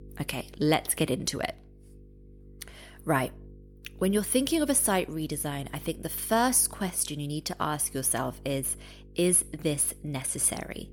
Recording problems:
electrical hum; faint; throughout; 50 Hz, 30 dB below the speech

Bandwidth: 18 kHz